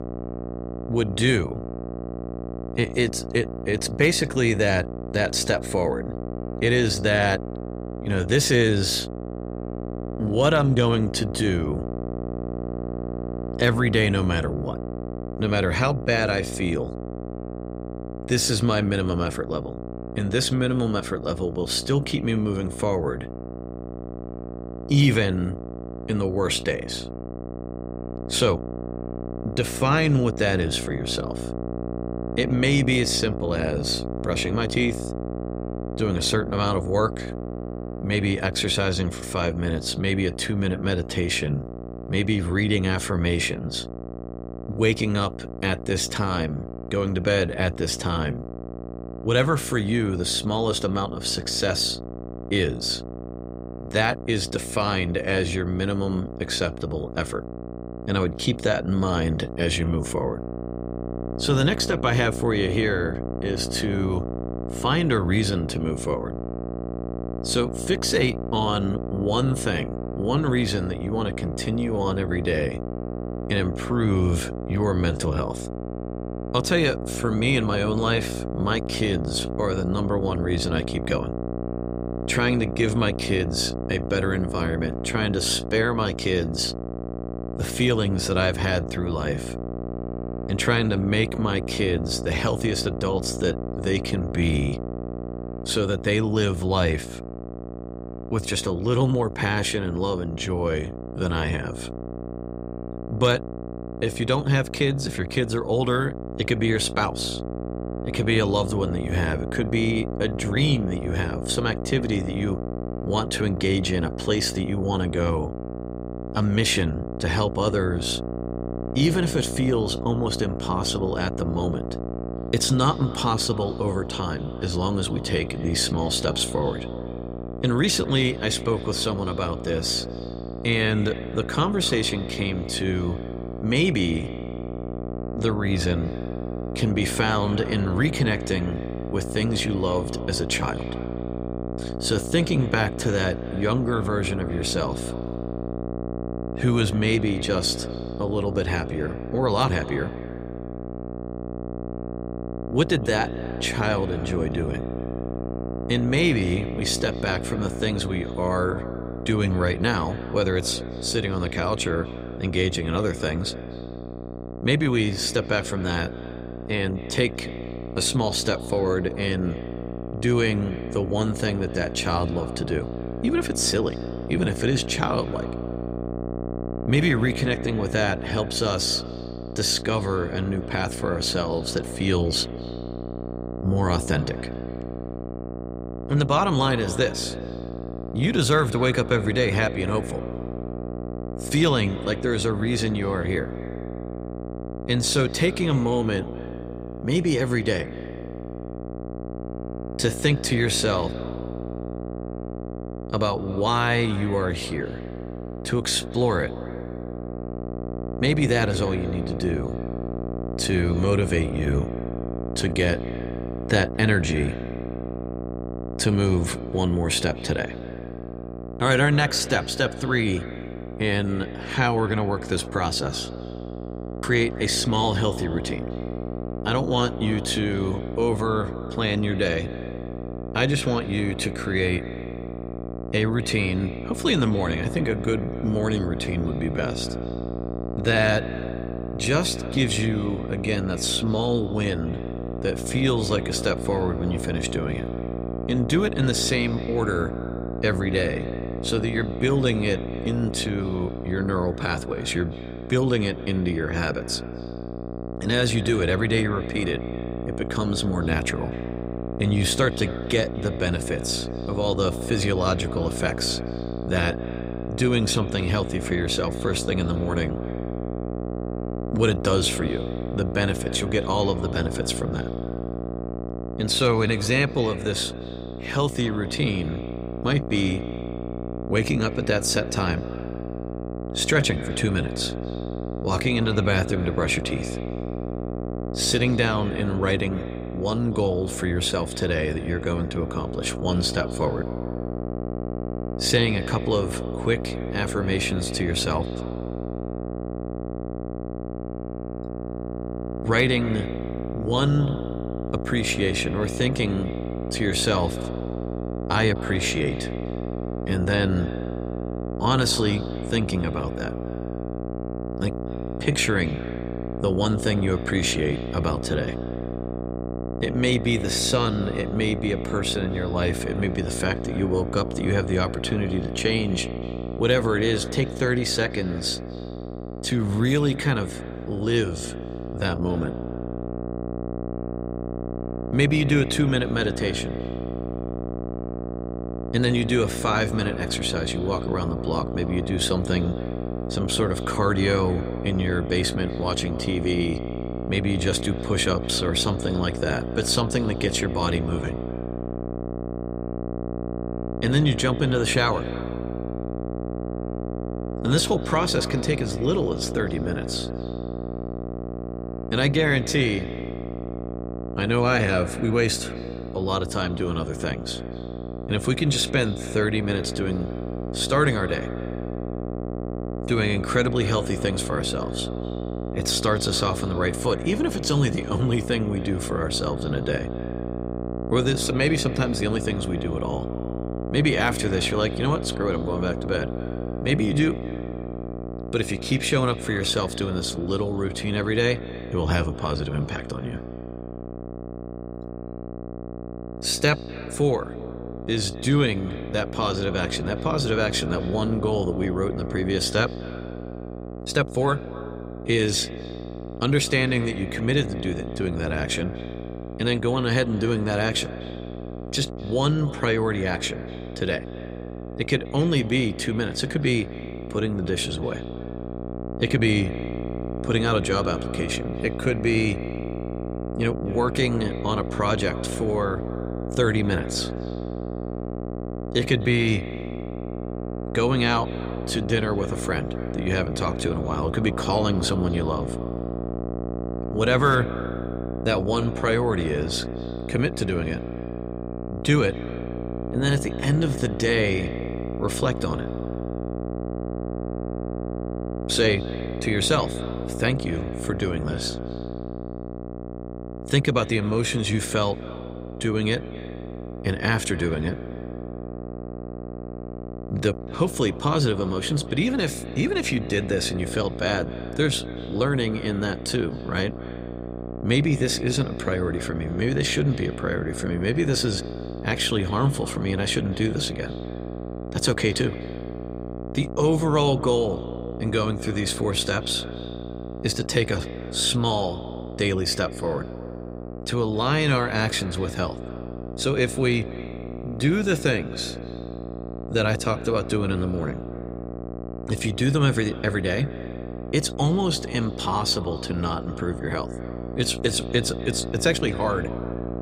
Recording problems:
echo of what is said; faint; from 2:02 on; 250 ms later, 20 dB below the speech
electrical hum; loud; throughout; 60 Hz, 10 dB below the speech

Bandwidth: 15.5 kHz